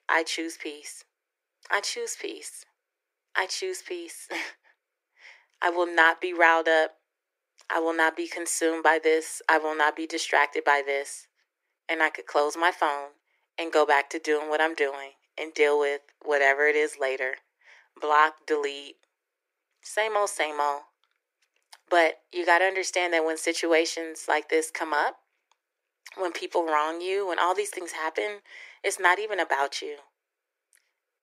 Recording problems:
thin; very; fading below 300 Hz

